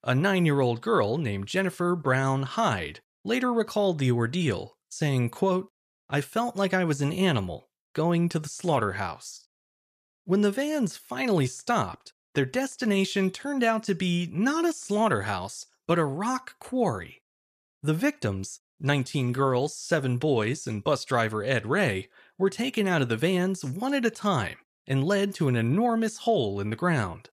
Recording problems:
none

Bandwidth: 14.5 kHz